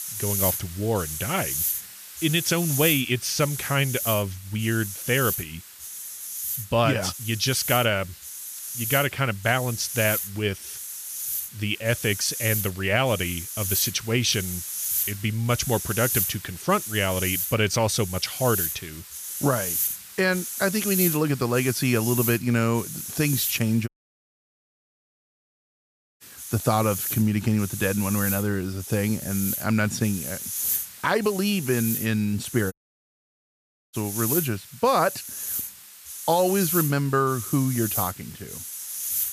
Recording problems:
hiss; loud; throughout; 4 dB below the speech
audio cutting out; at 24 s for 2.5 s and at 33 s for 1 s

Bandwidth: 14.5 kHz